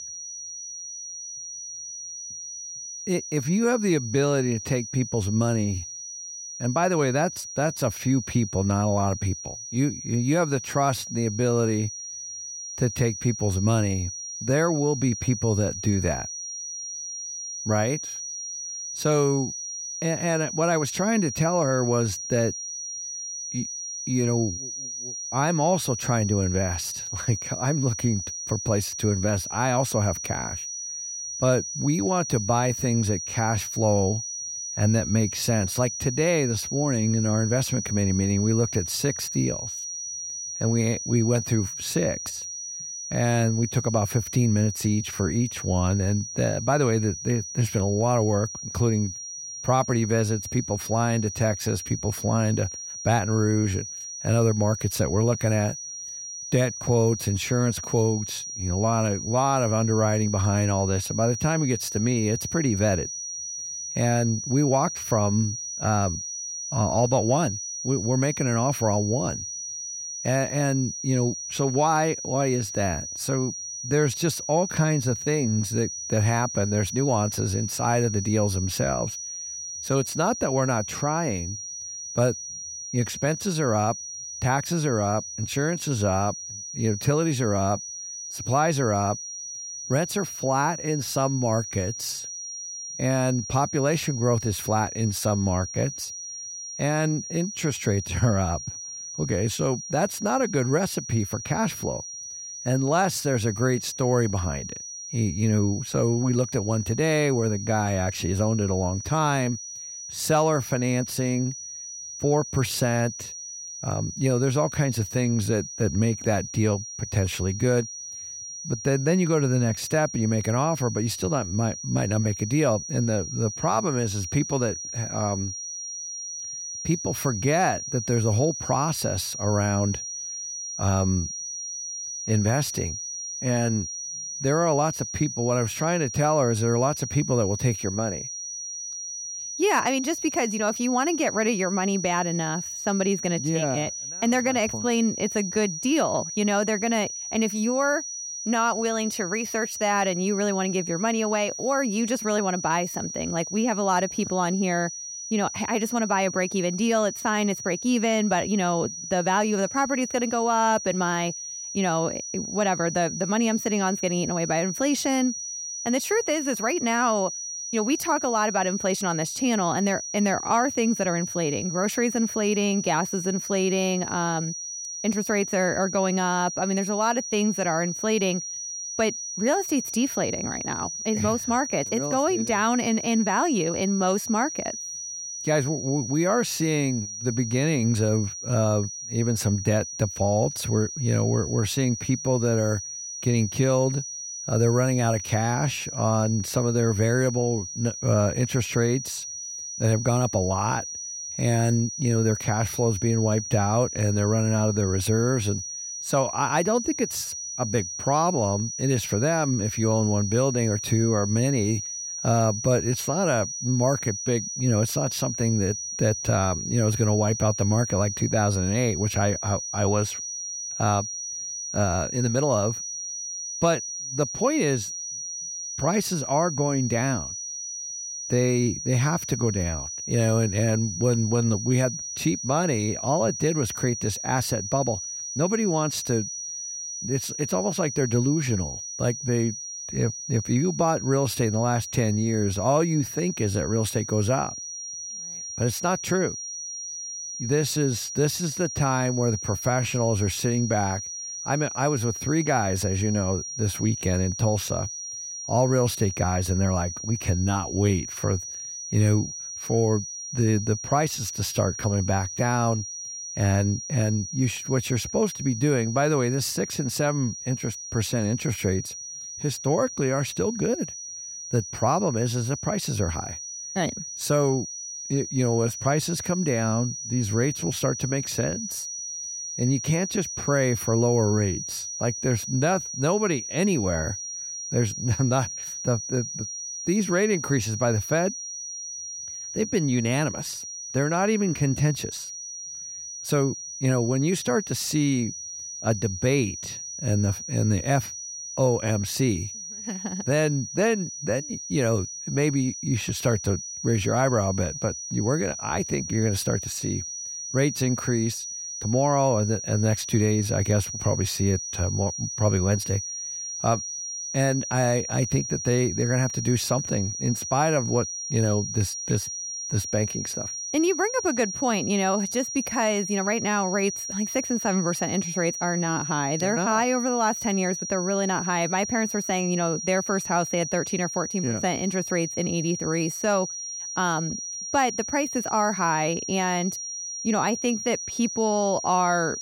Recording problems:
high-pitched whine; loud; throughout; 6 kHz, 7 dB below the speech

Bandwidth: 16 kHz